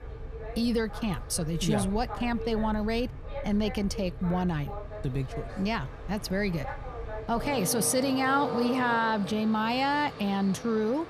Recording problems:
train or aircraft noise; loud; throughout; 10 dB below the speech

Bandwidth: 14.5 kHz